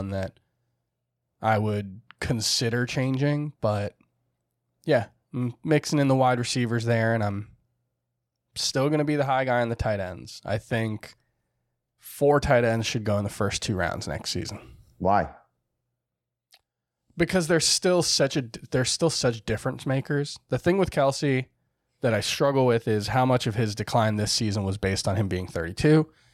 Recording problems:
abrupt cut into speech; at the start

